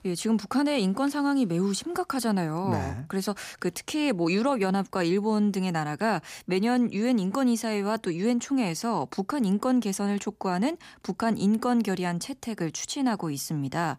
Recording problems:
none

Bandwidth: 15 kHz